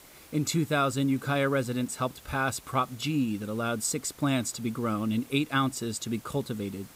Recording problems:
hiss; faint; throughout; 20 dB below the speech

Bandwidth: 15.5 kHz